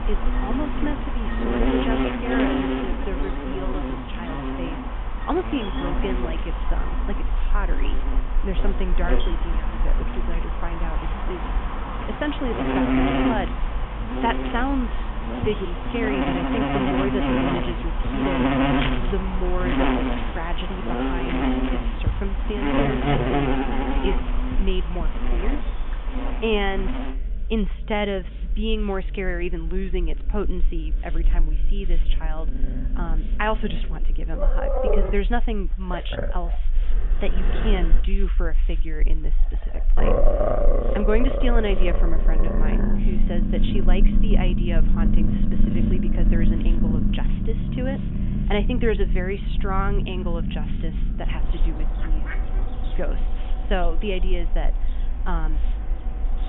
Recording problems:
high frequencies cut off; severe; nothing above 3.5 kHz
animal sounds; very loud; throughout; 3 dB above the speech
hiss; faint; throughout; 25 dB below the speech
low rumble; faint; throughout; 25 dB below the speech

